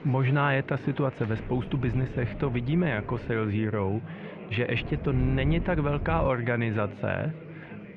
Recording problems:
muffled; very; fading above 2.5 kHz
chatter from many people; noticeable; throughout; 15 dB below the speech
wind noise on the microphone; occasional gusts; from 1.5 to 3.5 s and from 5 to 6.5 s; 15 dB below the speech

